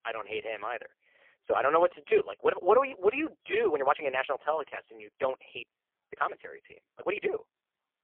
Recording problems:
phone-call audio; poor line
uneven, jittery; strongly; from 1.5 to 7.5 s

